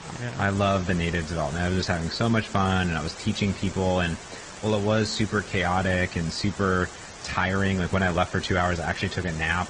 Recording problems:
garbled, watery; slightly; nothing above 8 kHz
hiss; noticeable; throughout; 15 dB below the speech

